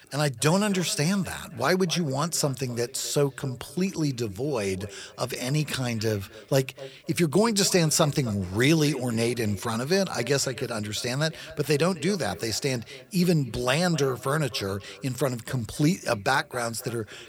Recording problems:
echo of what is said; faint; throughout; 260 ms later, 20 dB below the speech

